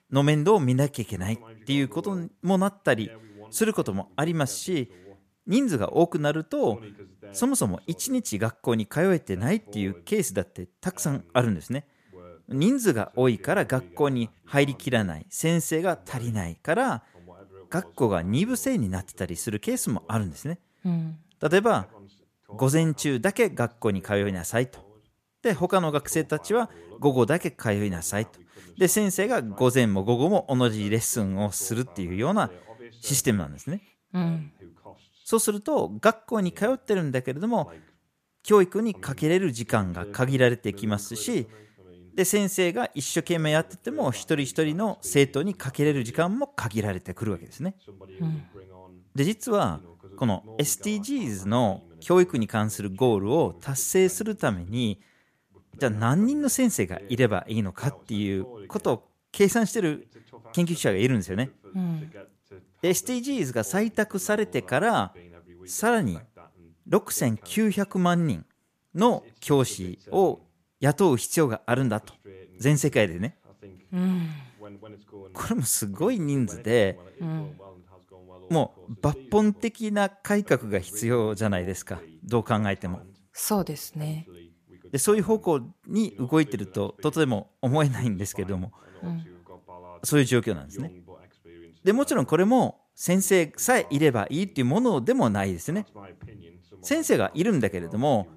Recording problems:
voice in the background; faint; throughout; 25 dB below the speech

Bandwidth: 14.5 kHz